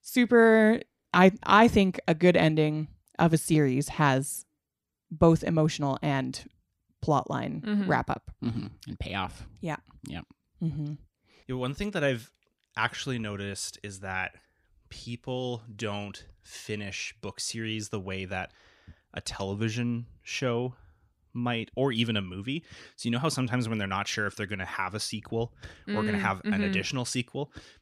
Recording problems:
none

